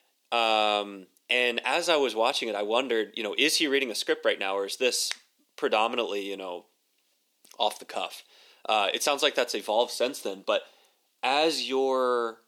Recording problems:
thin; somewhat; fading below 300 Hz

